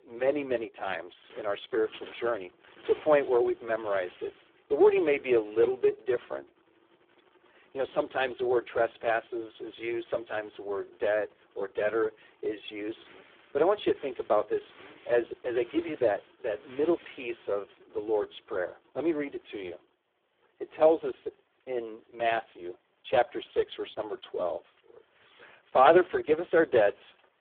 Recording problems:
phone-call audio; poor line
traffic noise; faint; throughout; 25 dB below the speech

